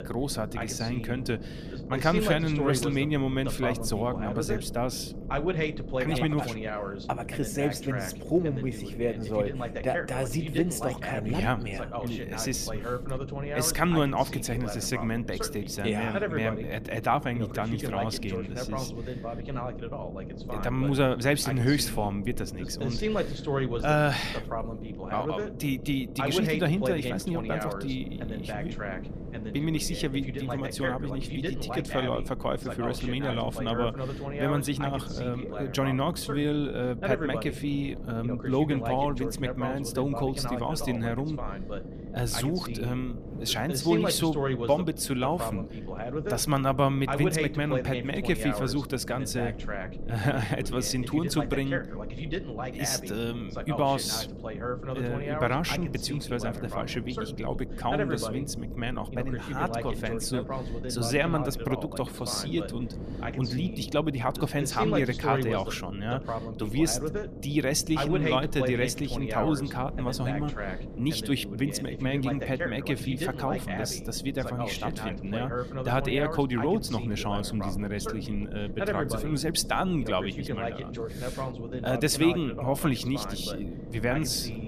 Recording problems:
voice in the background; loud; throughout; 6 dB below the speech
wind noise on the microphone; occasional gusts; 25 dB below the speech
low rumble; noticeable; throughout; 15 dB below the speech

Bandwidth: 14.5 kHz